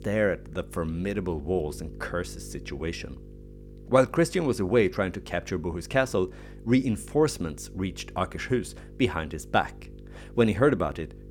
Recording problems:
electrical hum; faint; throughout; 50 Hz, 25 dB below the speech

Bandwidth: 18 kHz